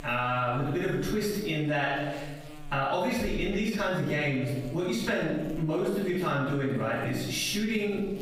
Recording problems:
off-mic speech; far
room echo; noticeable; dies away in 0.8 s
squashed, flat; somewhat
electrical hum; faint; throughout; 60 Hz, 25 dB below the speech

